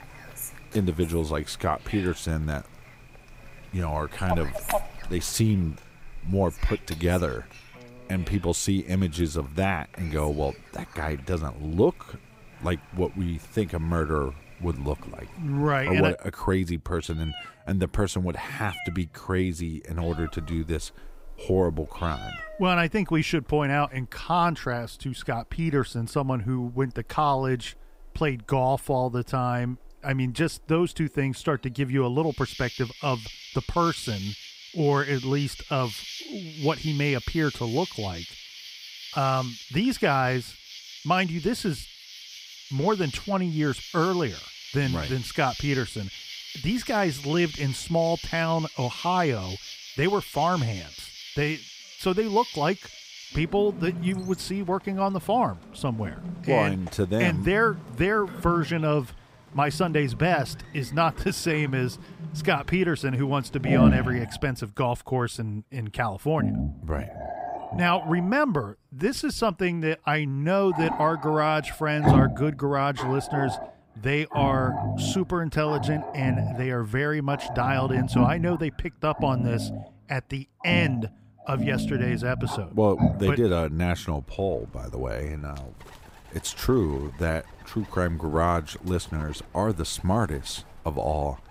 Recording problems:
animal sounds; loud; throughout; 7 dB below the speech

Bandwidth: 15.5 kHz